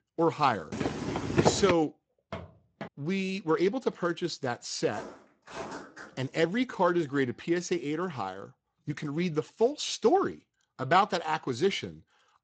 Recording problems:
garbled, watery; slightly; nothing above 7.5 kHz
footsteps; loud; from 0.5 to 1.5 s; peak 3 dB above the speech
footsteps; faint; at 2.5 s and from 5 to 6.5 s; peak 10 dB below the speech

